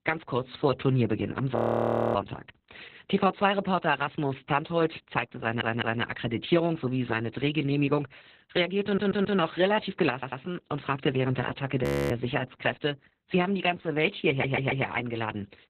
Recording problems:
garbled, watery; badly; nothing above 14.5 kHz
audio freezing; at 1.5 s for 0.5 s and at 12 s
audio stuttering; 4 times, first at 5.5 s

